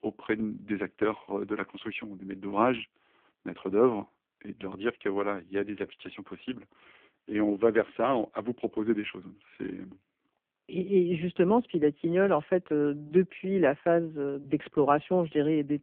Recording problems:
phone-call audio; poor line

